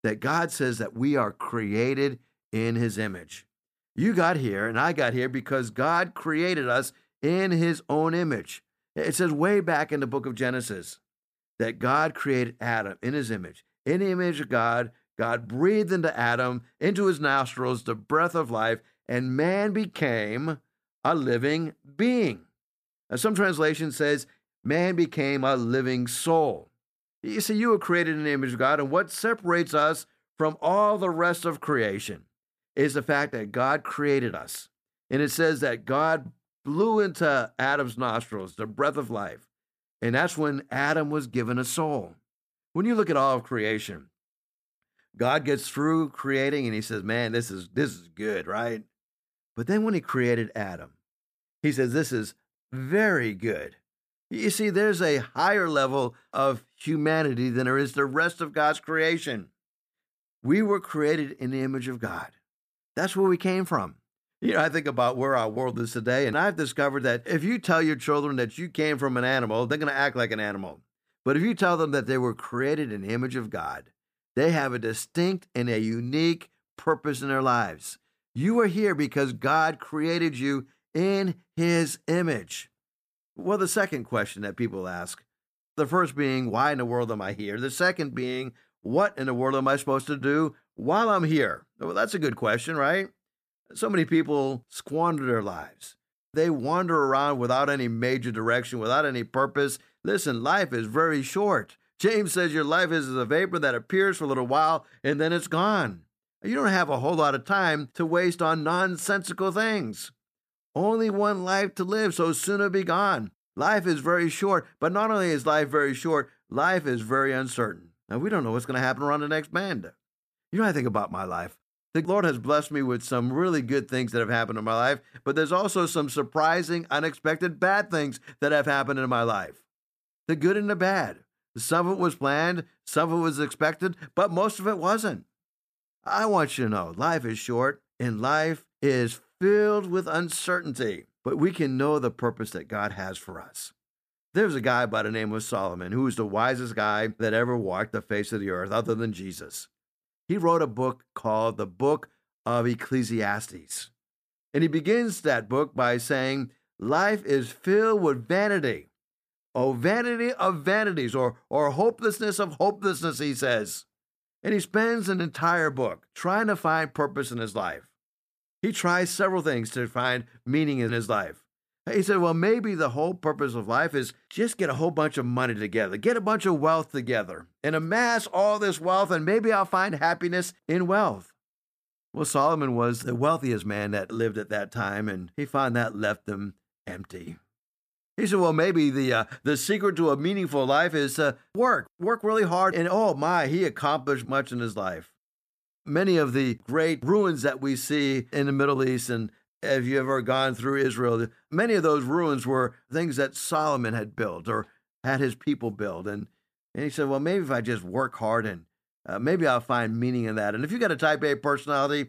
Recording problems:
none

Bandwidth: 14.5 kHz